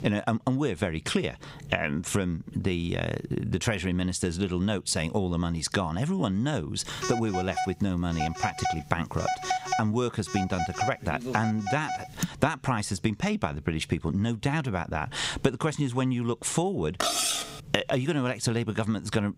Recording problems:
squashed, flat; somewhat
phone ringing; noticeable; from 7 to 12 s; peak level with the speech
clattering dishes; loud; at 17 s; peak 4 dB above the speech

